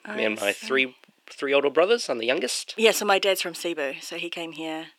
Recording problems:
thin; somewhat; fading below 350 Hz

